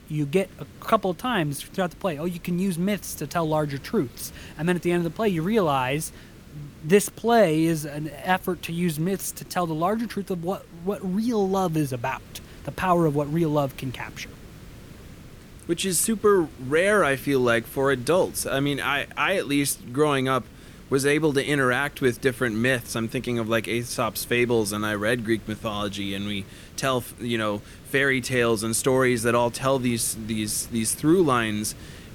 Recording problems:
hiss; faint; throughout; 20 dB below the speech

